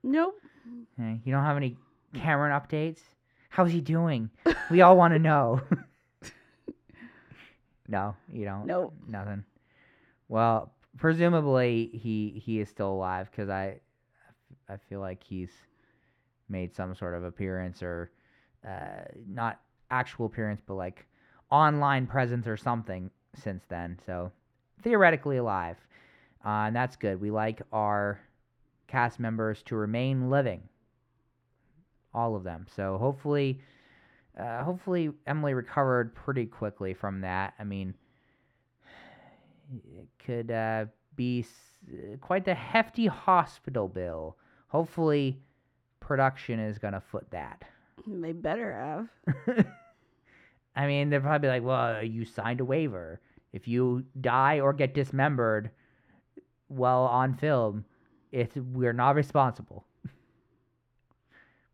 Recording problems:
muffled; slightly; fading above 3.5 kHz

